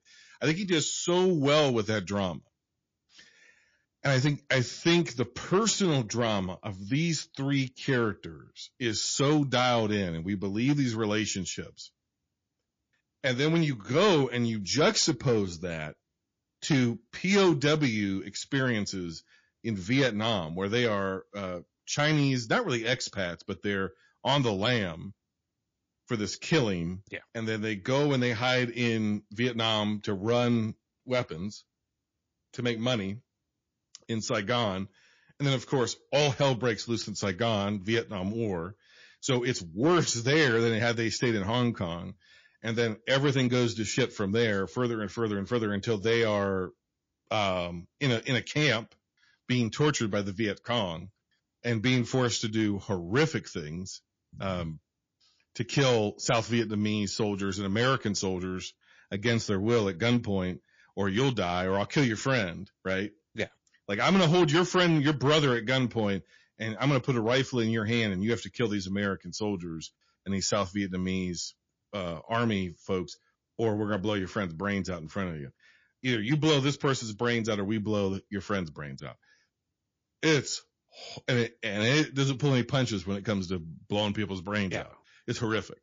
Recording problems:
distortion; slight; 2% of the sound clipped
garbled, watery; slightly

